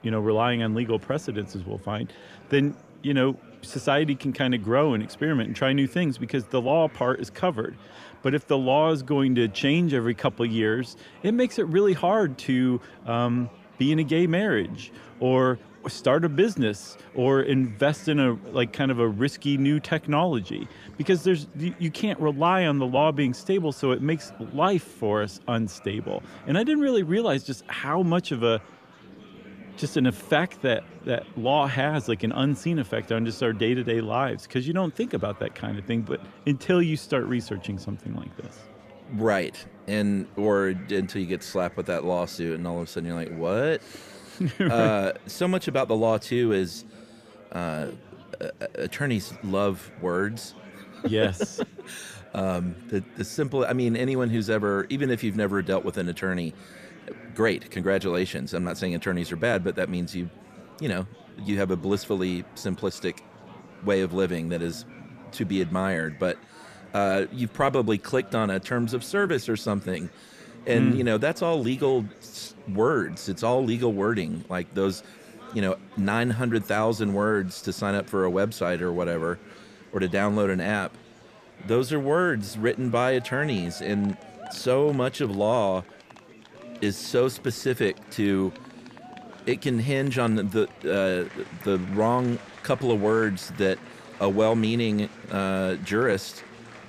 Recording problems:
murmuring crowd; faint; throughout; 20 dB below the speech

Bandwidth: 14.5 kHz